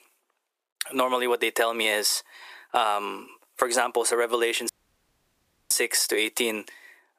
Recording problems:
thin; very; fading below 350 Hz
squashed, flat; somewhat
audio cutting out; at 4.5 s for 1 s

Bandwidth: 15 kHz